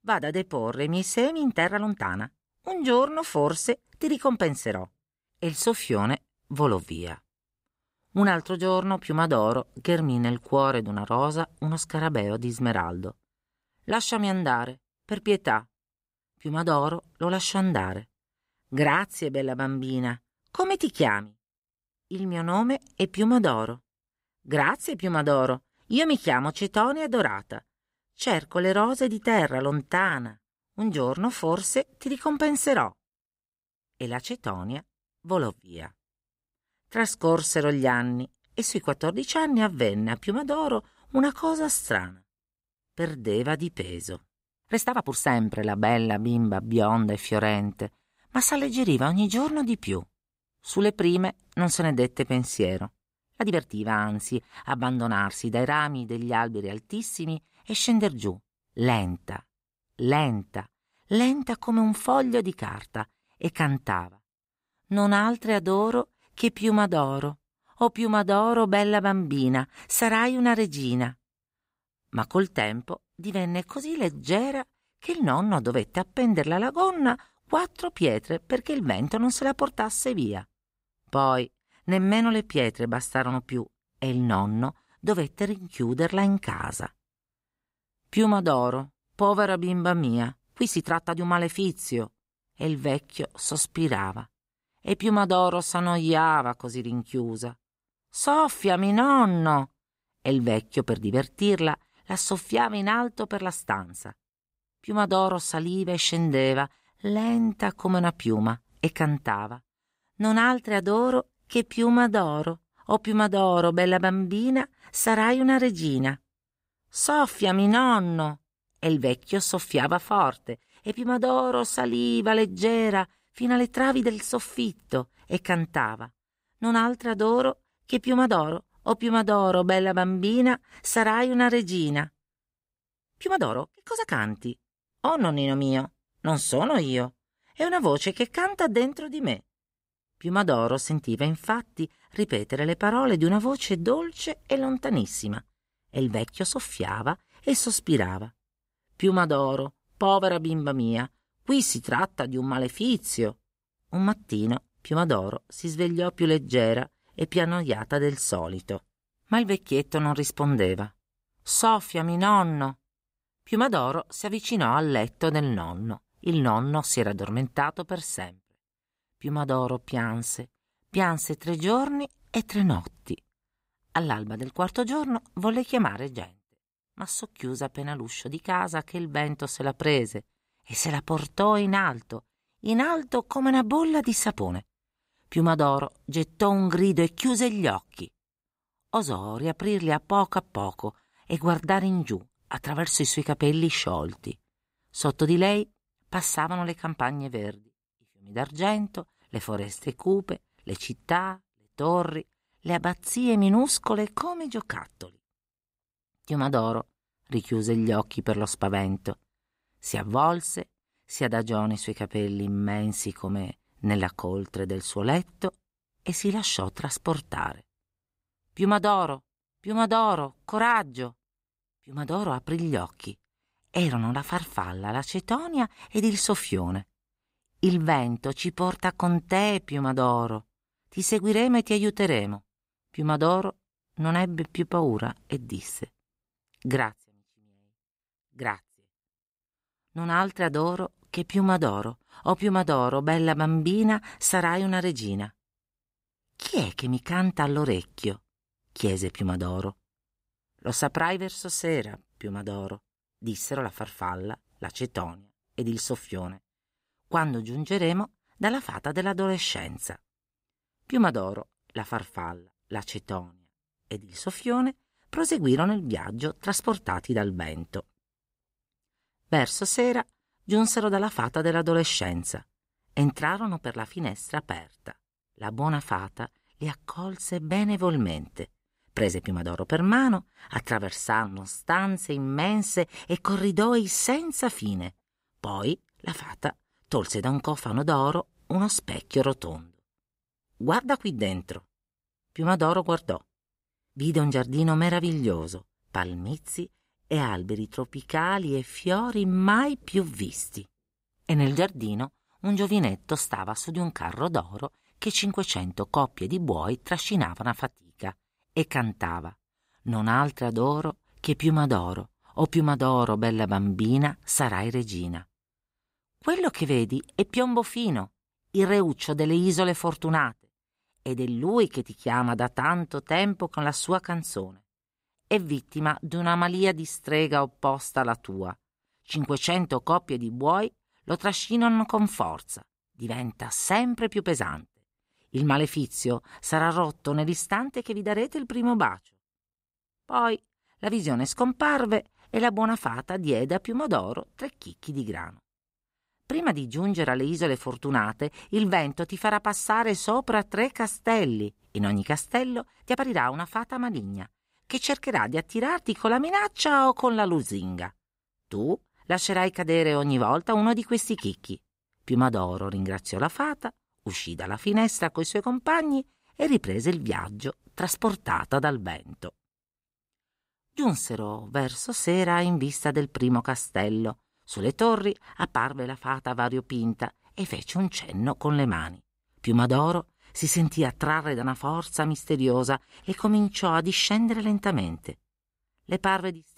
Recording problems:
uneven, jittery; strongly; from 1.5 s to 6:24

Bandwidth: 15.5 kHz